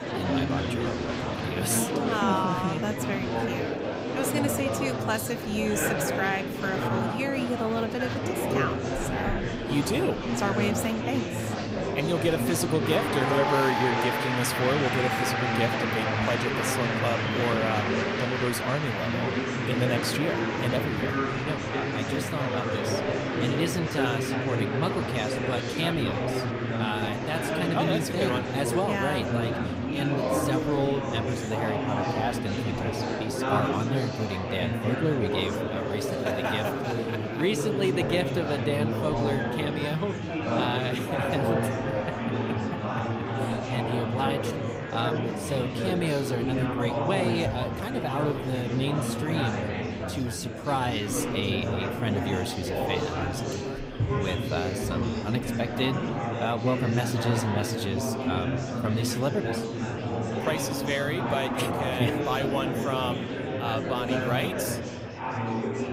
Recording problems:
murmuring crowd; very loud; throughout; 1 dB above the speech

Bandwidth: 15.5 kHz